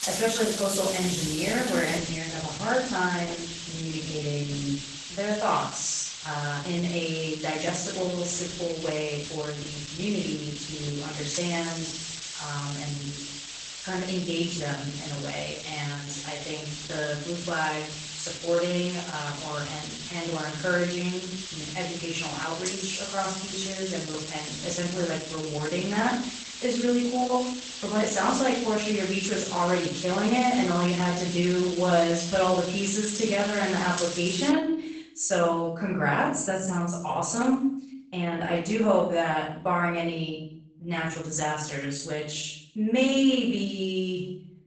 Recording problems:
off-mic speech; far
garbled, watery; badly; nothing above 8 kHz
room echo; noticeable; dies away in 0.6 s
hiss; loud; until 35 s; 6 dB below the speech

